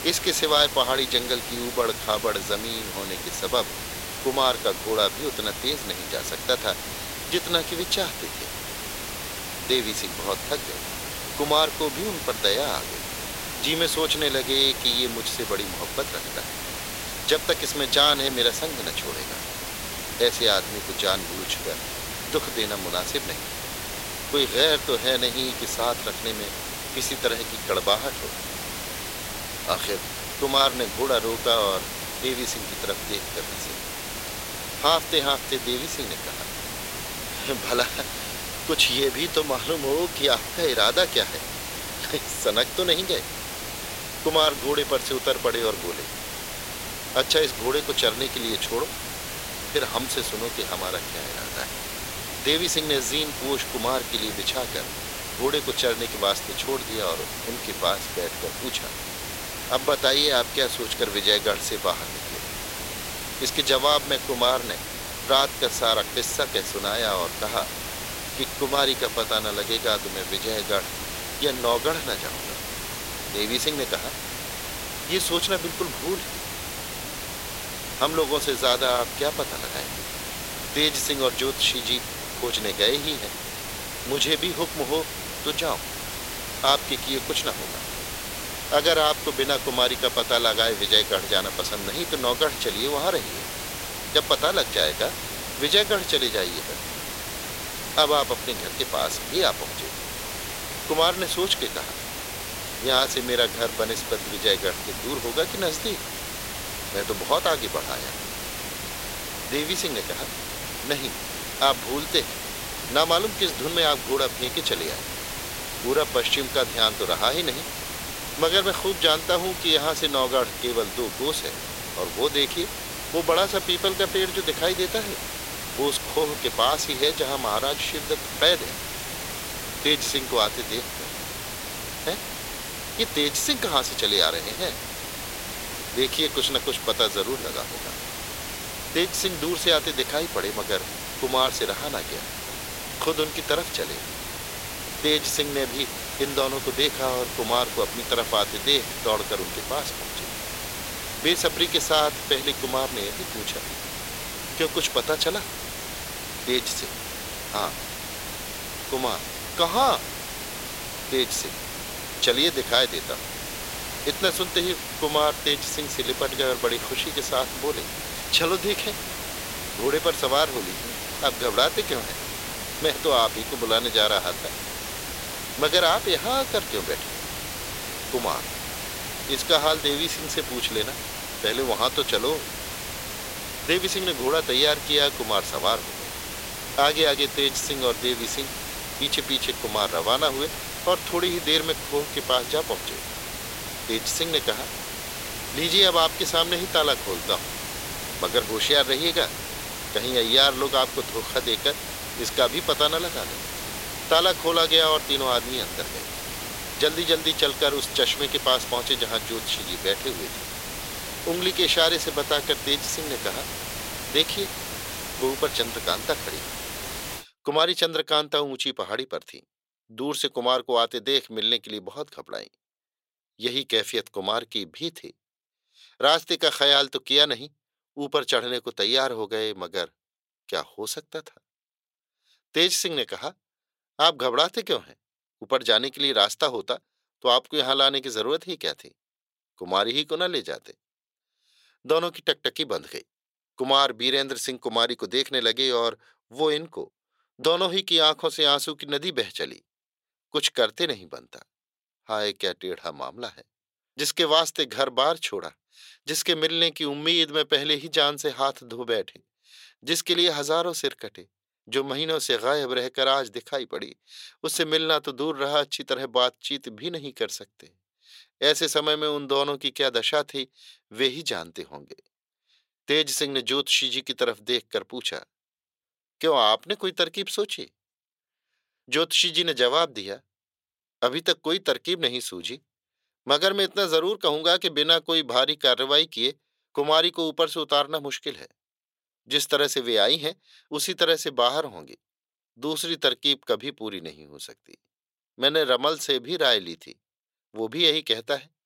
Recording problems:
thin; very; fading below 500 Hz
hiss; loud; until 3:37; 7 dB below the speech

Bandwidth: 16 kHz